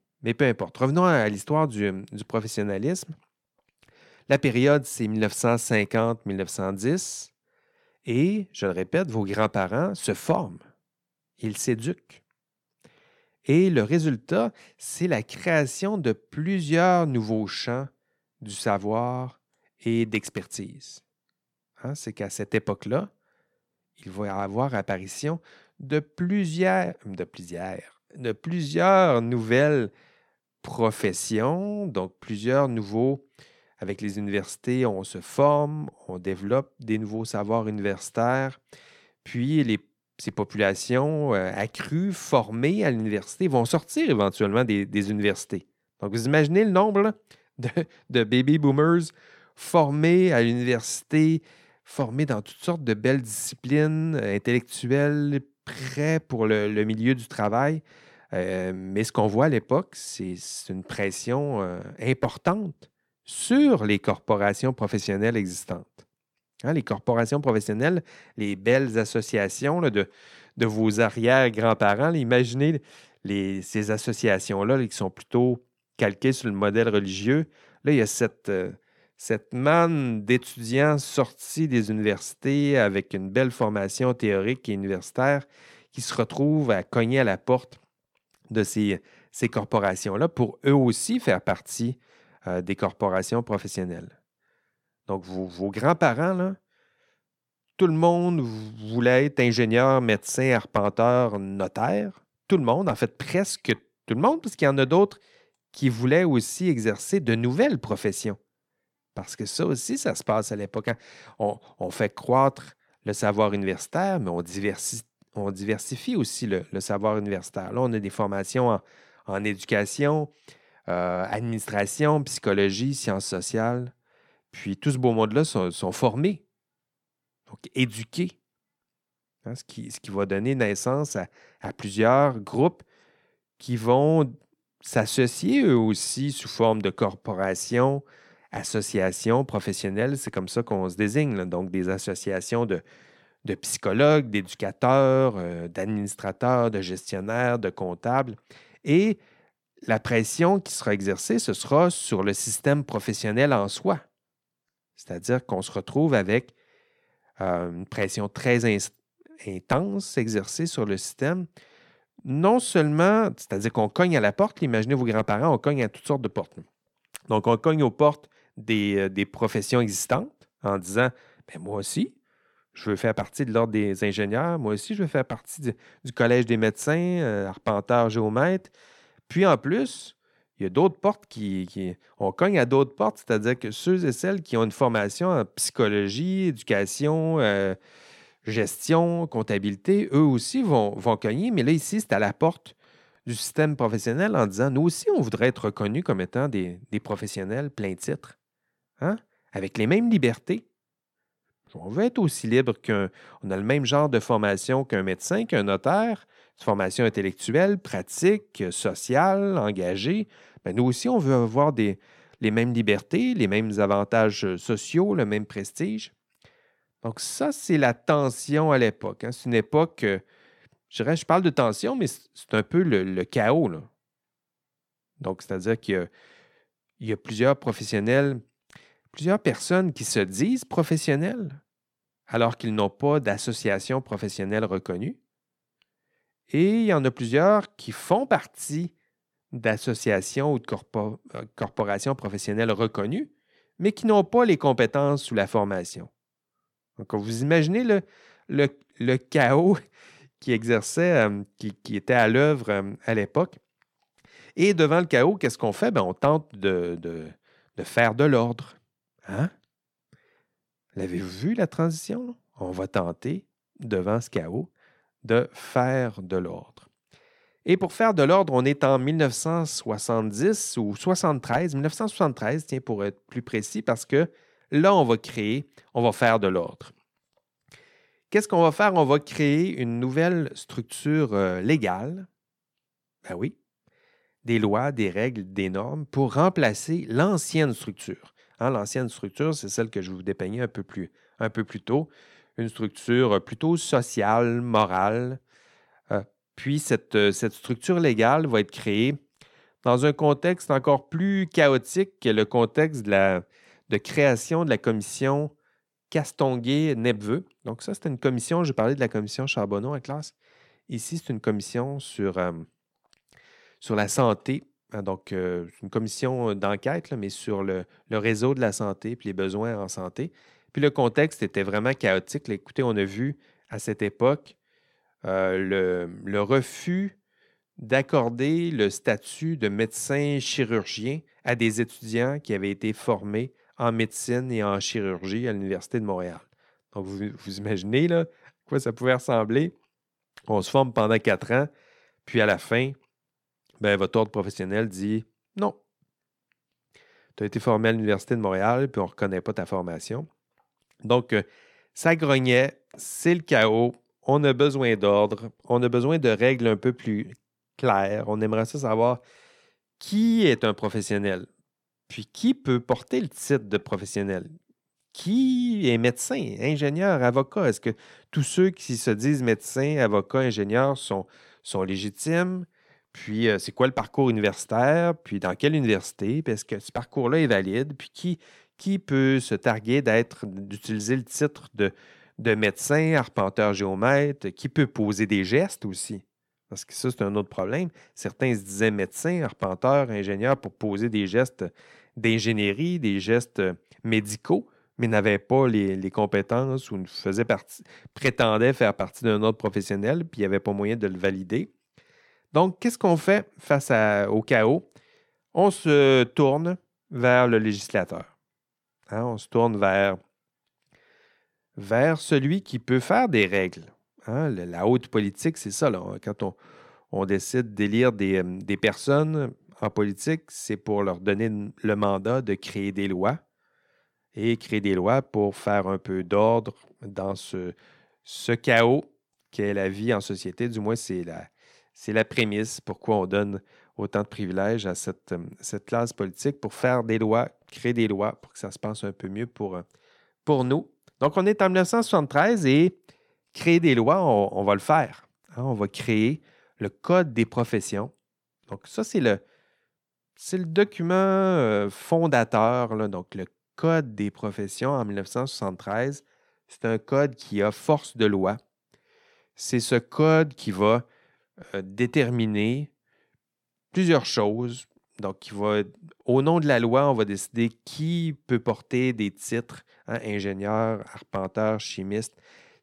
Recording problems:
none

